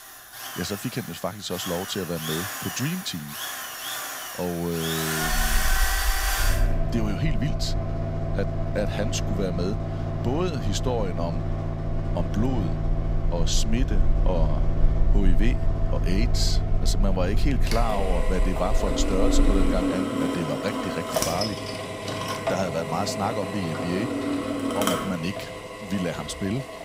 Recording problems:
machinery noise; very loud; throughout; as loud as the speech
low rumble; faint; from 5.5 to 20 s; 25 dB below the speech

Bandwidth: 15.5 kHz